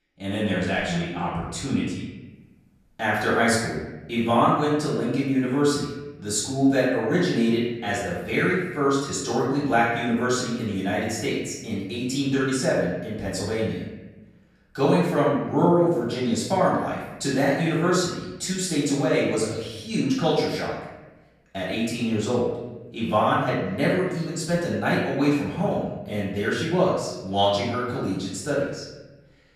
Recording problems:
off-mic speech; far
room echo; noticeable; dies away in 1 s

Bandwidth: 14.5 kHz